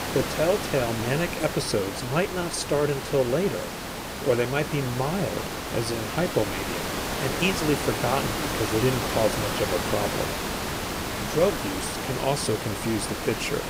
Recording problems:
hiss; loud; throughout; 3 dB below the speech

